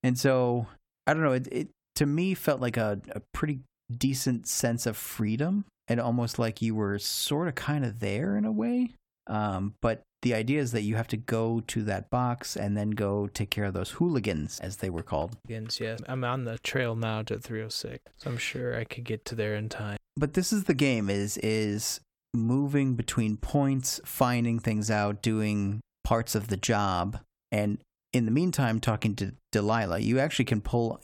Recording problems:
none

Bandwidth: 17 kHz